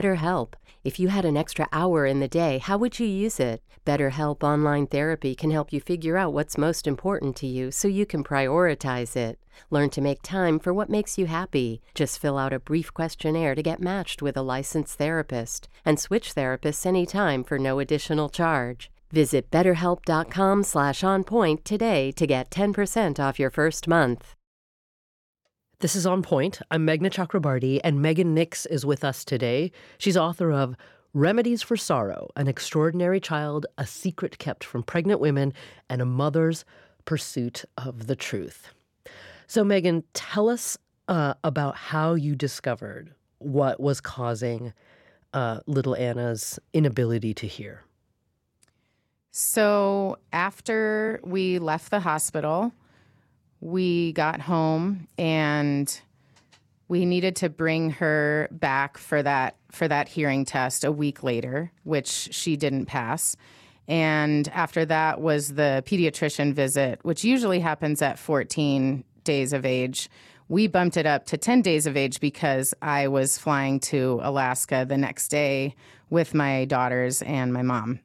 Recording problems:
abrupt cut into speech; at the start

